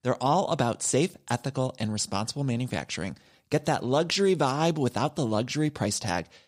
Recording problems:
none

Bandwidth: 15.5 kHz